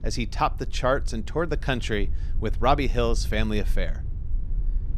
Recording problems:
low rumble; faint; throughout; 25 dB below the speech

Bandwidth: 14.5 kHz